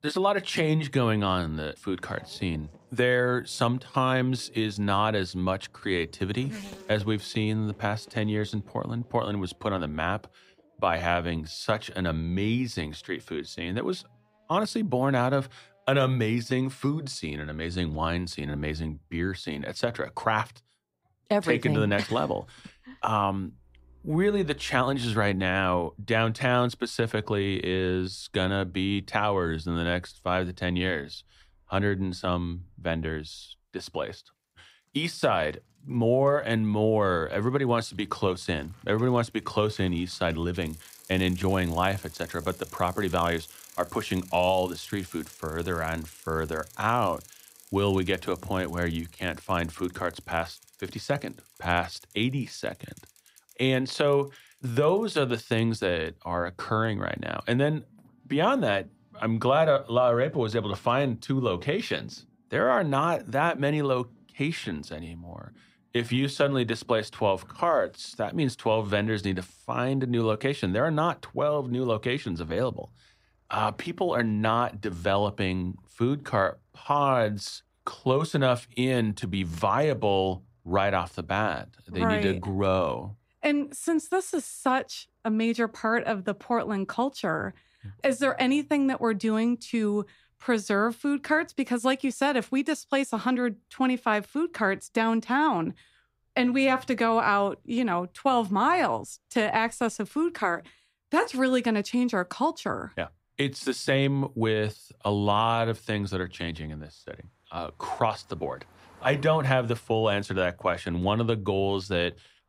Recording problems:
traffic noise; faint; throughout; 25 dB below the speech

